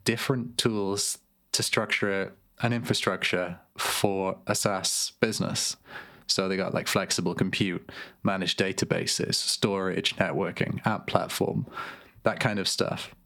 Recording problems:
squashed, flat; somewhat

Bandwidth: 18.5 kHz